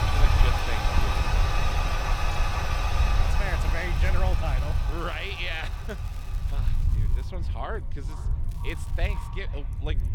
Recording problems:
echo of what is said; noticeable; from 7 s on; 480 ms later, 15 dB below the speech
household noises; very loud; throughout; 5 dB above the speech
low rumble; noticeable; throughout; 10 dB below the speech
crackling; noticeable; from 3 to 7 s and at 8.5 s; 20 dB below the speech
voice in the background; faint; throughout; 25 dB below the speech

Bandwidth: 18 kHz